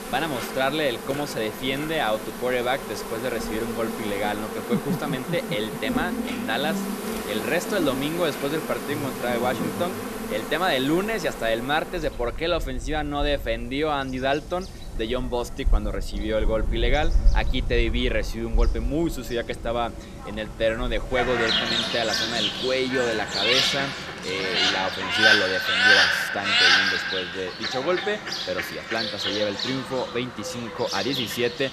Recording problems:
animal sounds; very loud; throughout; 2 dB above the speech

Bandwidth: 14.5 kHz